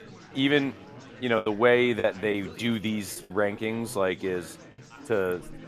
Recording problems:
chatter from many people; noticeable; throughout; 20 dB below the speech
choppy; very; from 1.5 to 3.5 s; 7% of the speech affected

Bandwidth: 14.5 kHz